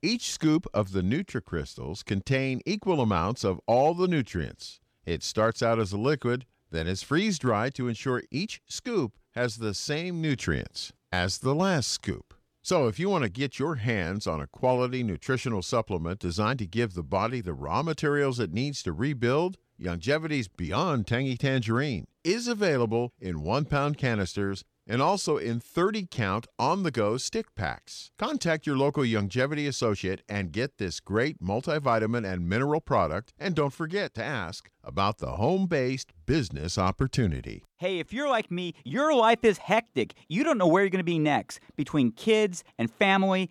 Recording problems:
none

